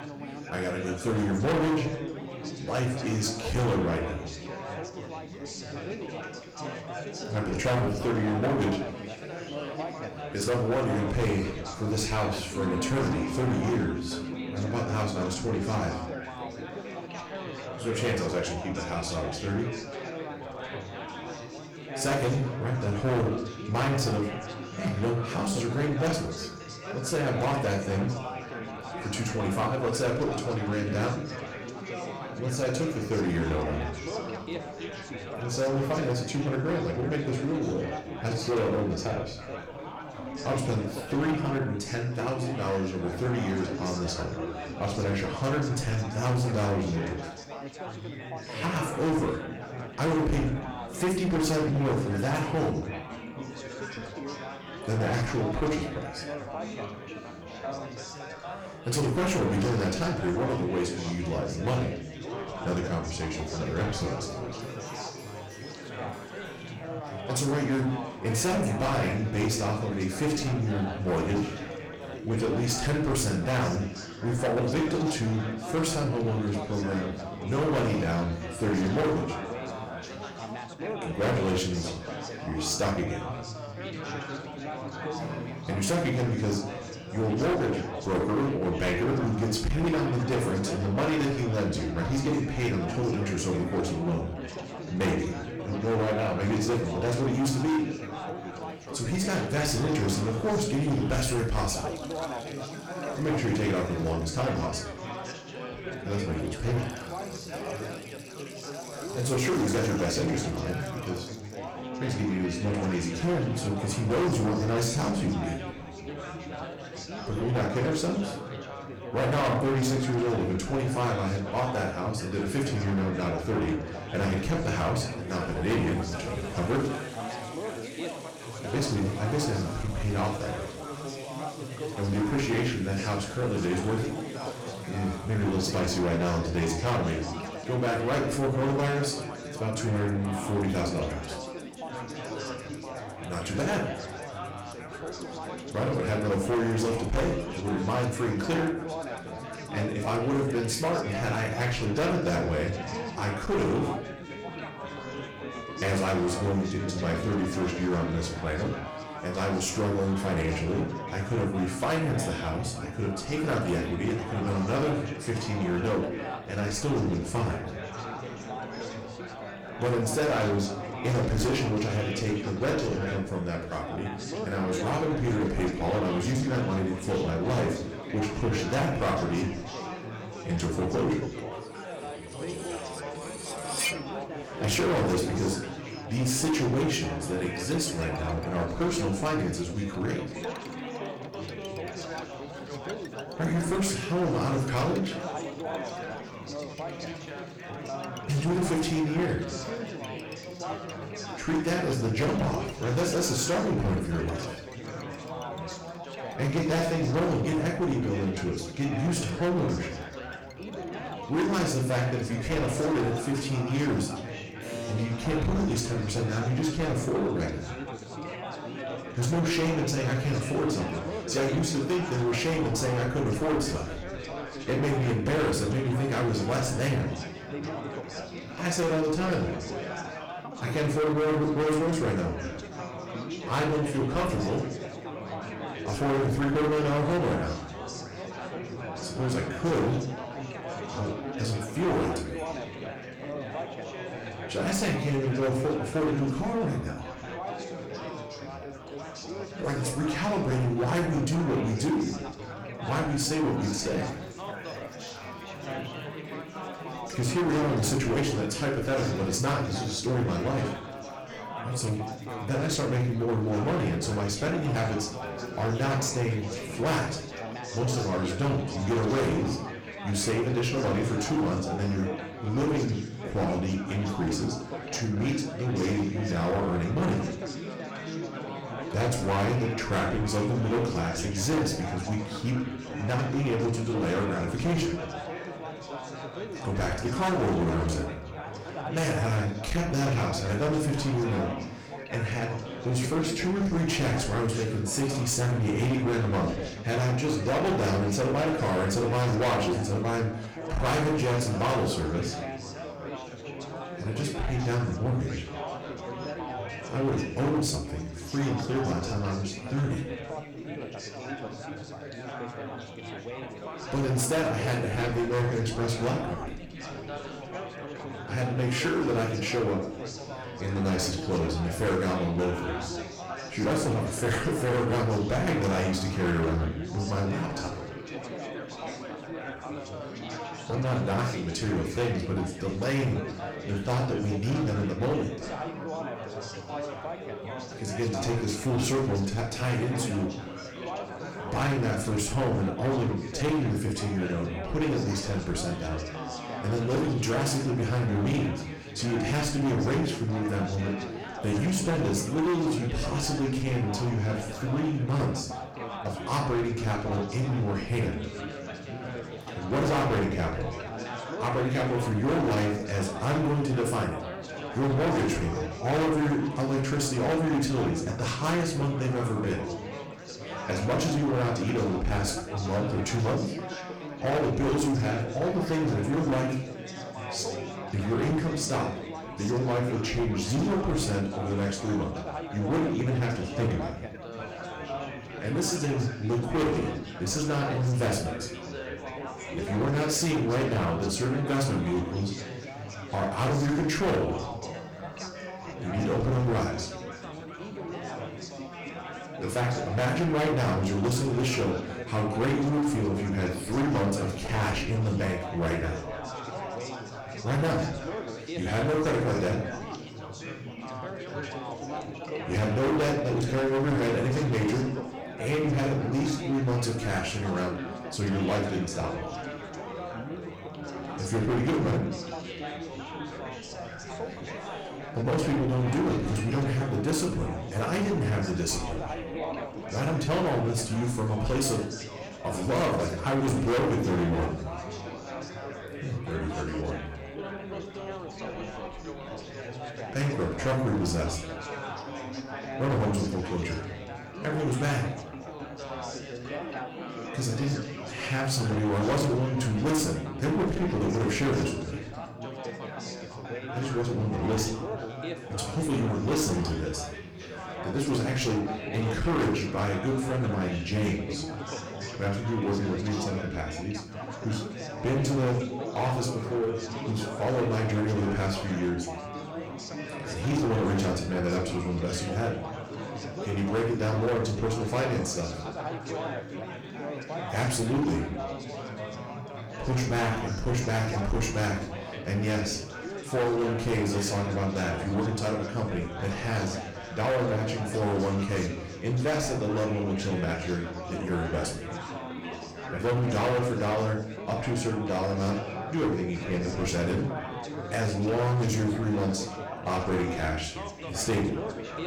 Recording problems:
distortion; heavy; 13% of the sound clipped
room echo; slight; dies away in 0.5 s
off-mic speech; somewhat distant
chatter from many people; loud; throughout; 9 dB below the speech
background music; noticeable; throughout; 20 dB below the speech
clattering dishes; loud; from 3:03 to 3:04; peak level with the speech

